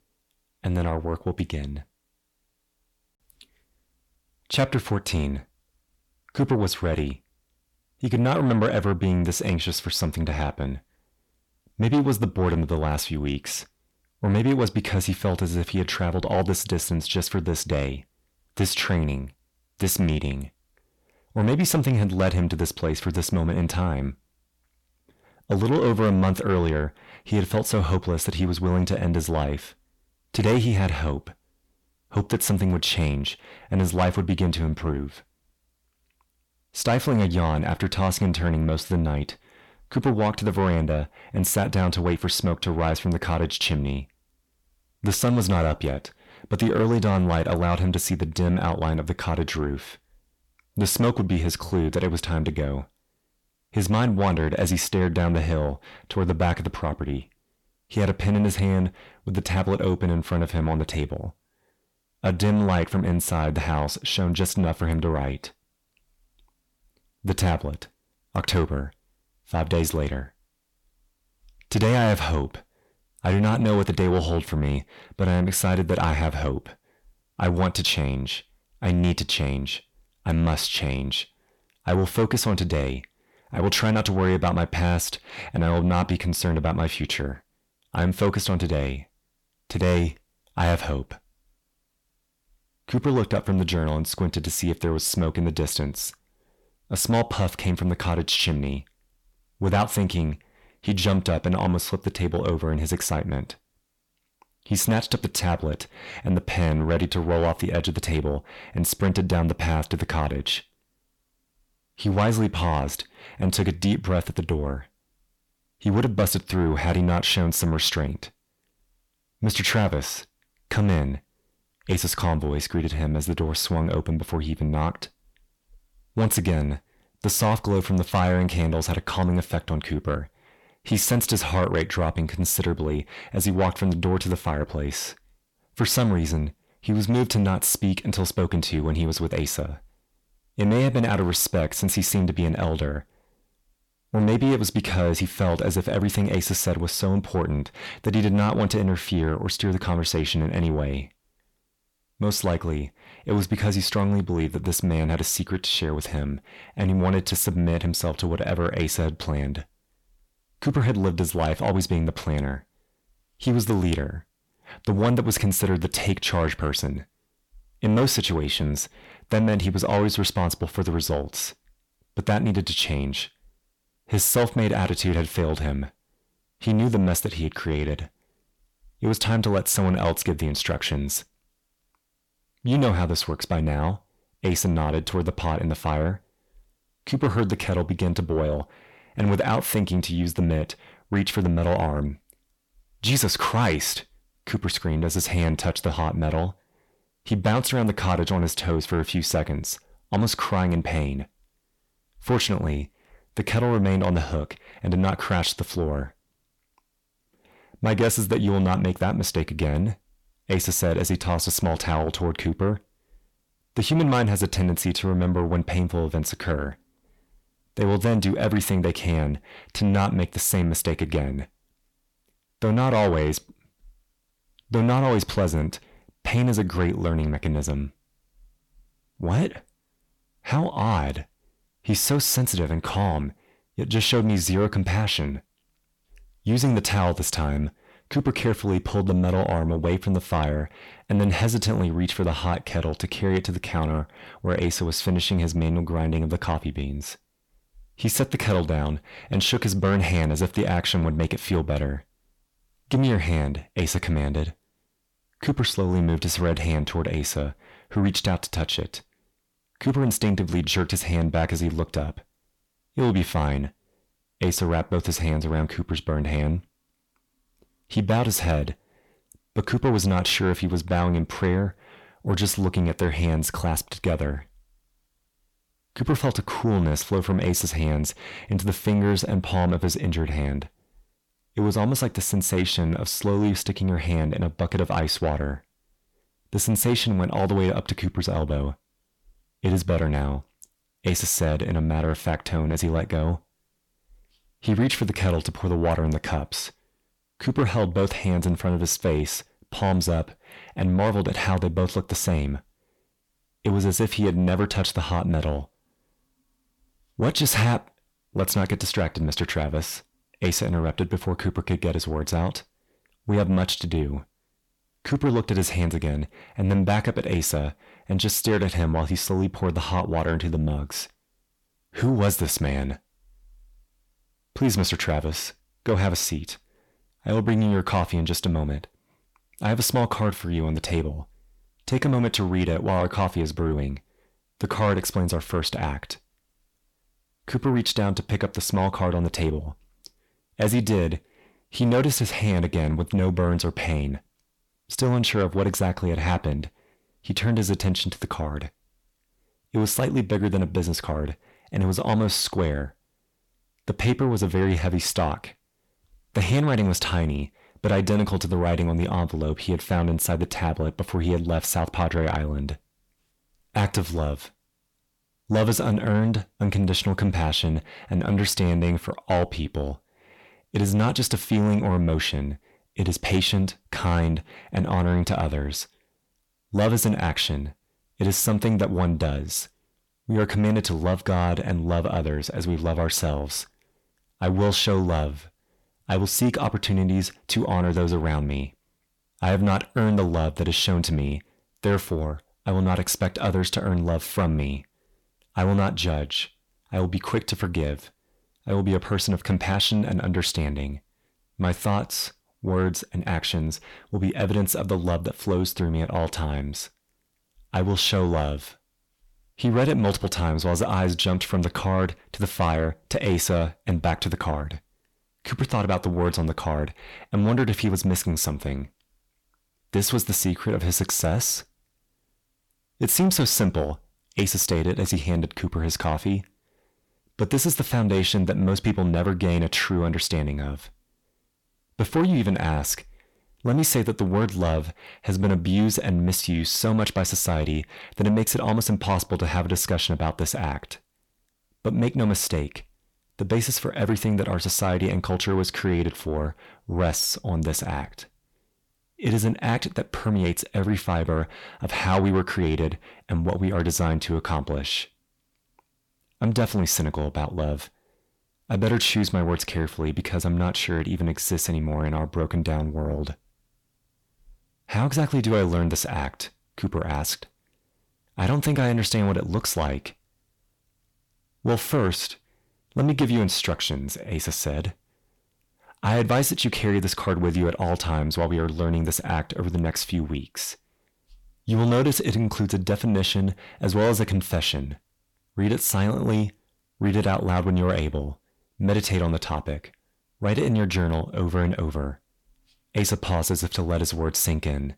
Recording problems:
distortion; slight; 10 dB below the speech

